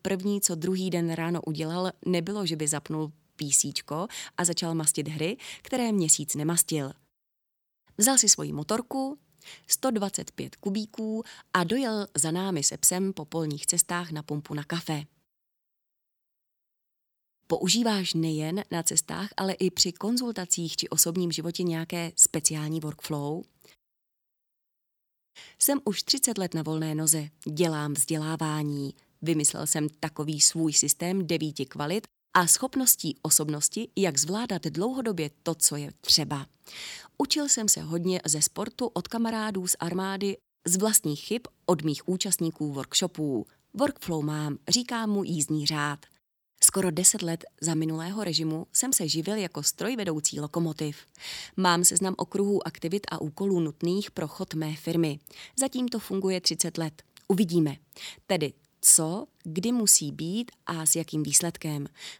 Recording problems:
none

